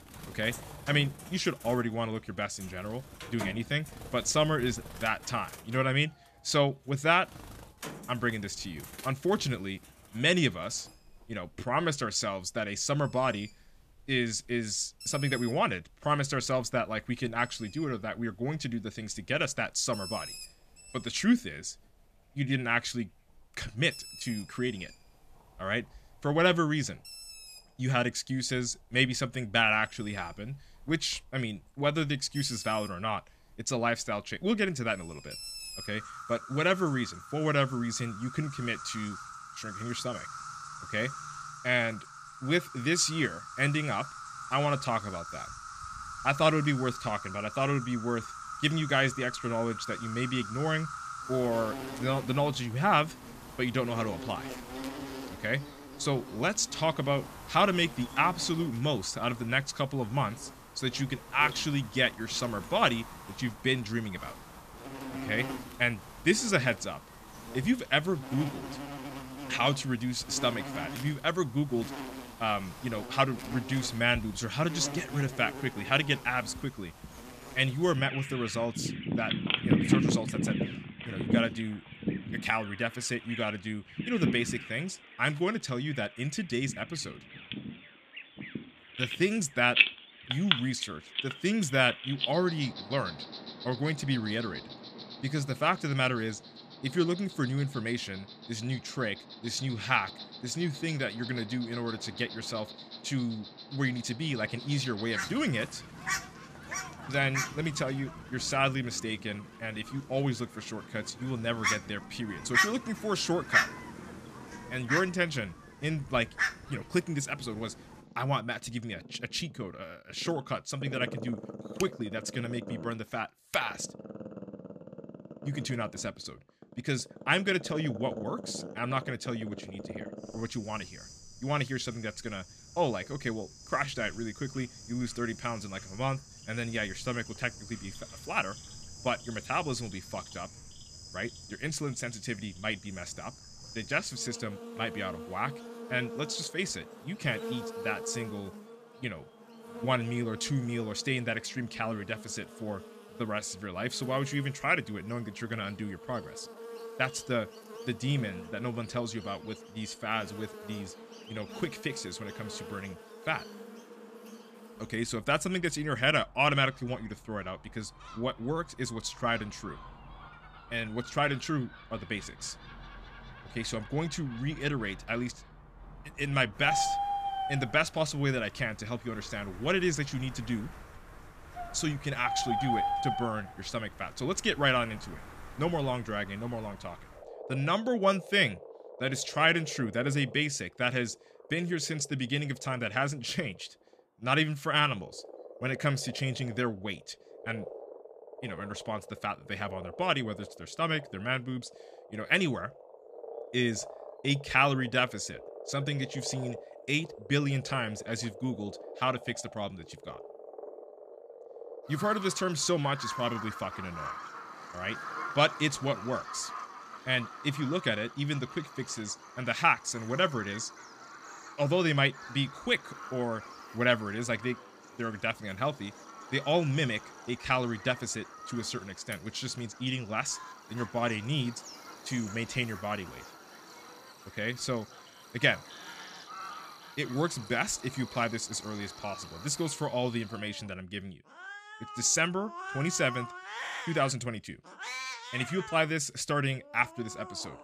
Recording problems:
animal sounds; loud; throughout; 9 dB below the speech

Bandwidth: 14.5 kHz